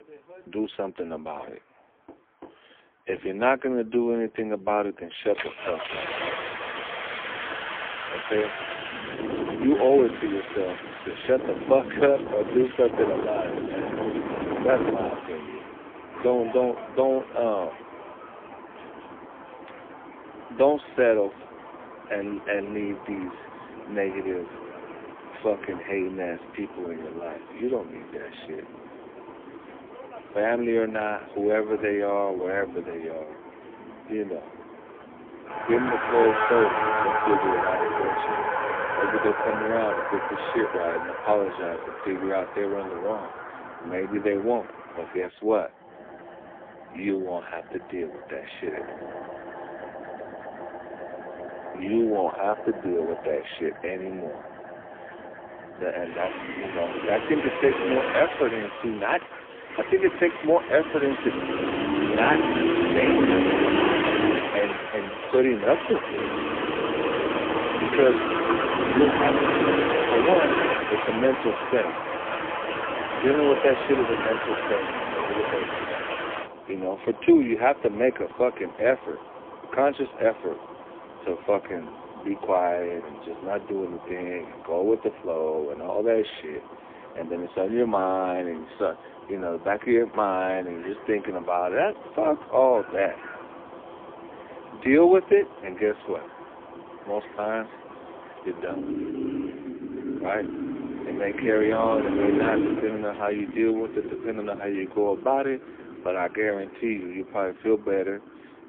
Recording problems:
phone-call audio; poor line; nothing above 3.5 kHz
traffic noise; loud; throughout; 3 dB below the speech

